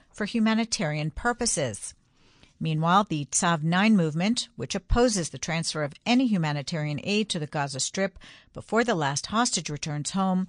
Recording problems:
garbled, watery; slightly; nothing above 9.5 kHz

